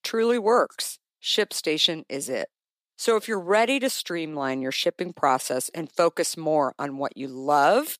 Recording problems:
thin; somewhat; fading below 450 Hz

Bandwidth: 15 kHz